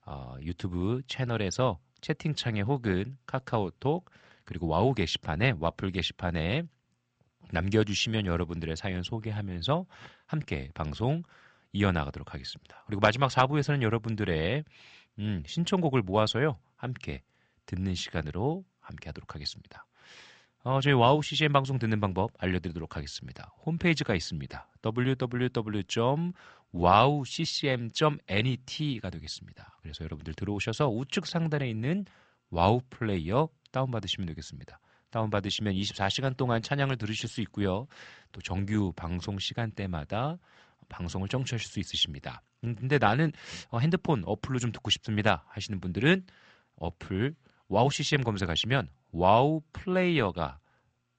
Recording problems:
high frequencies cut off; noticeable; nothing above 8 kHz

